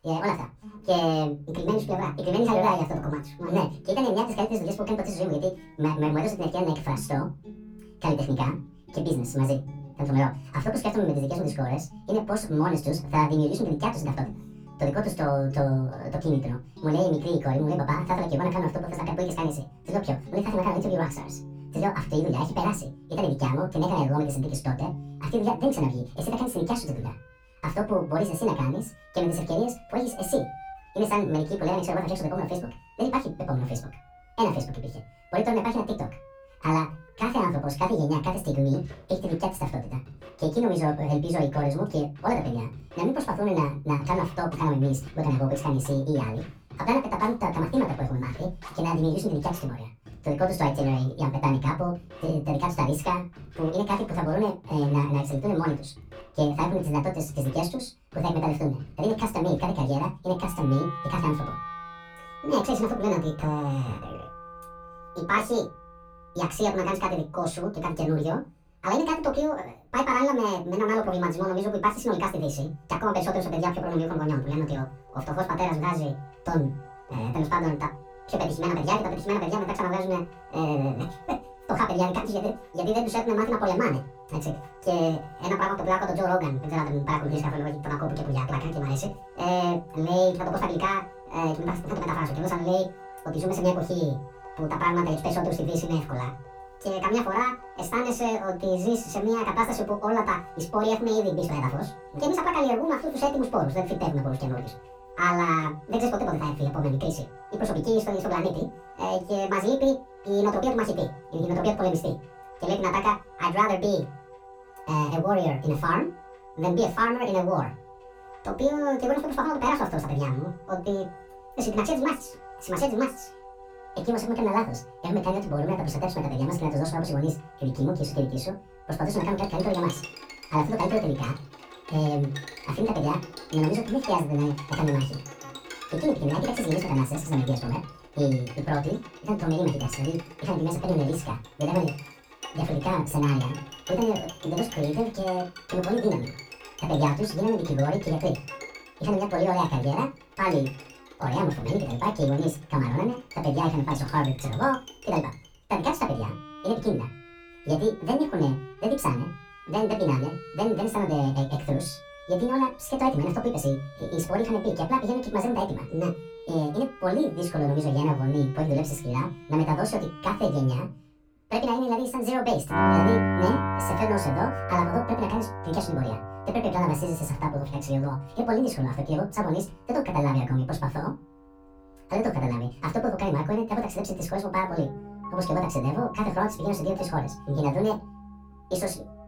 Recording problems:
off-mic speech; far
wrong speed and pitch; too fast and too high; 1.7 times normal speed
room echo; very slight; dies away in 0.2 s
background music; noticeable; throughout; 15 dB below the speech

